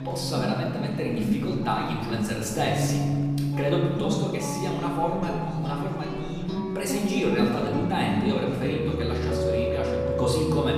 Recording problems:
off-mic speech; far
room echo; noticeable; dies away in 1.6 s
background music; loud; throughout; 2 dB below the speech
chatter from many people; faint; throughout; 20 dB below the speech

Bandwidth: 14.5 kHz